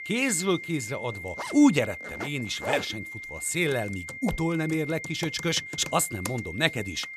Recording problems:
high-pitched whine; loud; throughout; 2 kHz, 10 dB below the speech
household noises; noticeable; throughout; 15 dB below the speech

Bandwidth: 14 kHz